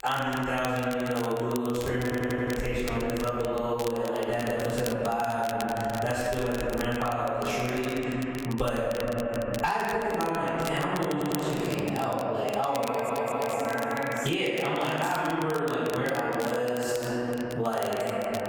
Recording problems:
room echo; strong; dies away in 2.2 s
off-mic speech; far
squashed, flat; somewhat
crackle, like an old record; very faint; 15 dB below the speech
audio stuttering; at 2 s, at 11 s and at 13 s

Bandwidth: 18.5 kHz